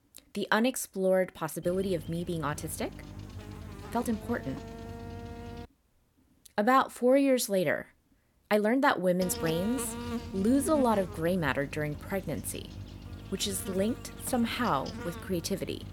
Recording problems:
electrical hum; noticeable; from 1.5 to 5.5 s and from 9 s on; 50 Hz, 15 dB below the speech
uneven, jittery; strongly; from 0.5 to 15 s

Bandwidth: 17.5 kHz